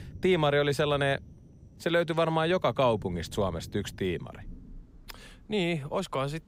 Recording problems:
rain or running water; faint; throughout; 20 dB below the speech

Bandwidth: 15.5 kHz